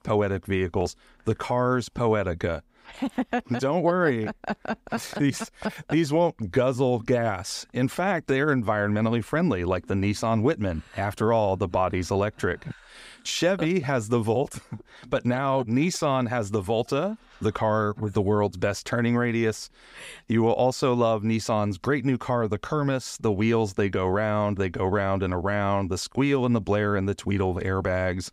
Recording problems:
none

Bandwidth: 15.5 kHz